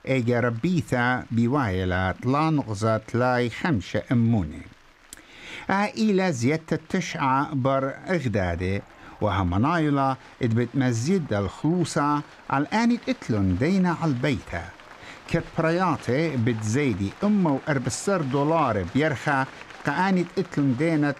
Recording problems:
crowd noise; faint; throughout; 25 dB below the speech

